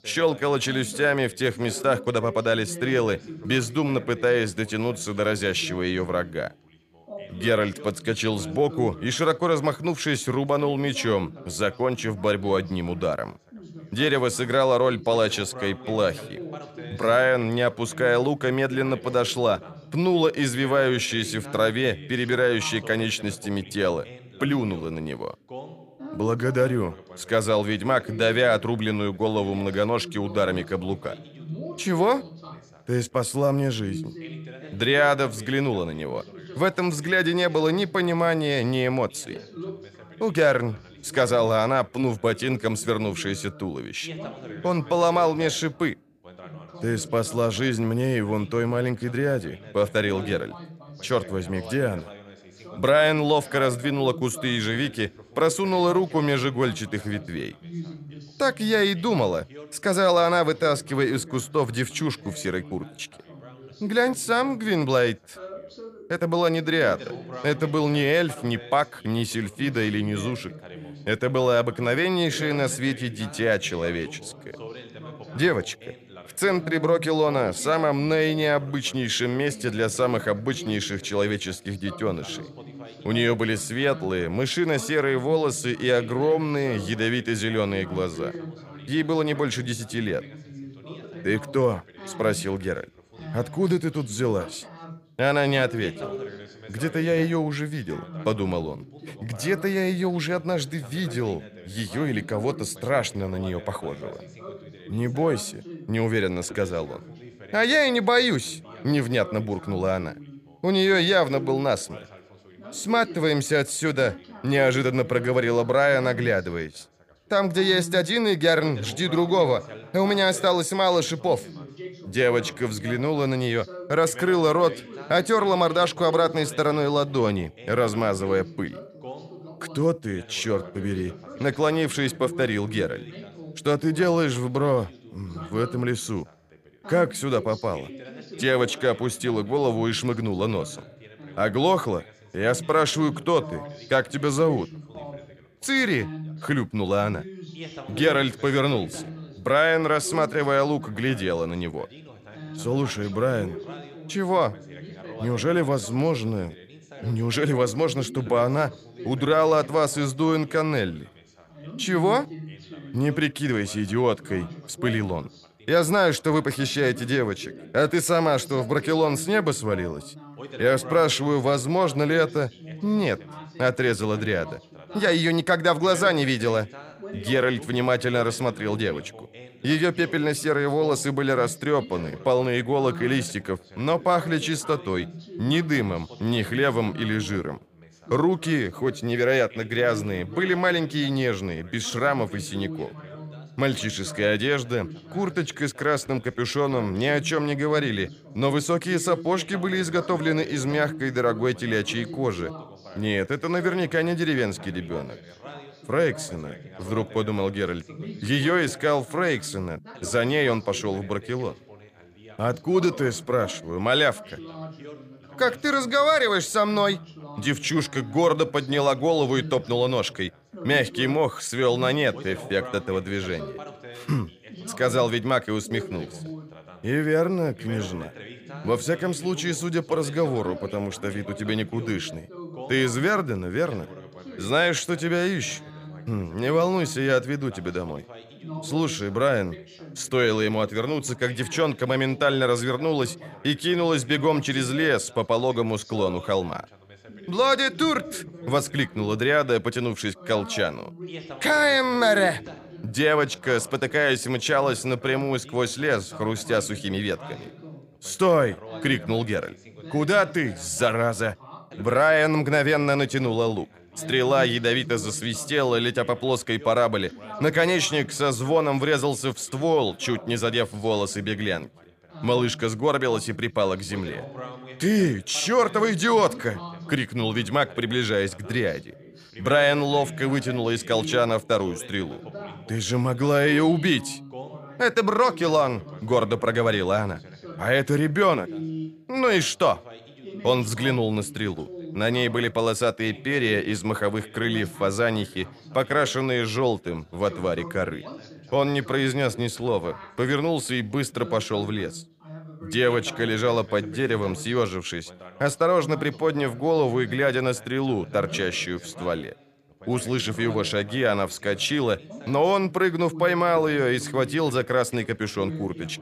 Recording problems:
background chatter; noticeable; throughout; 2 voices, 15 dB below the speech

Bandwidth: 15 kHz